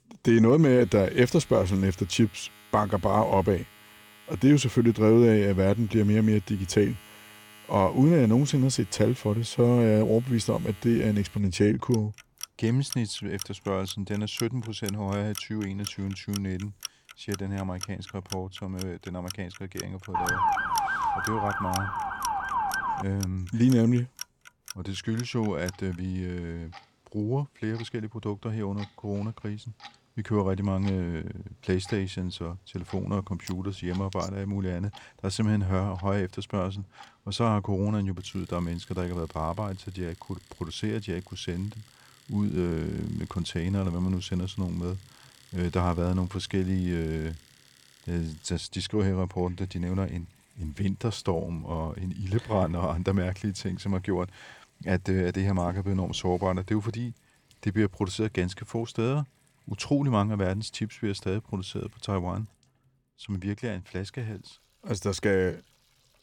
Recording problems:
household noises; noticeable; throughout; 15 dB below the speech
siren; loud; from 20 to 23 s; peak 3 dB above the speech

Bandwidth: 17 kHz